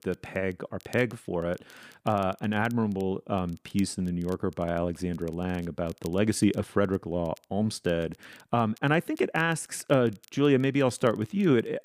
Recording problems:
crackle, like an old record; faint; 30 dB below the speech

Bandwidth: 15 kHz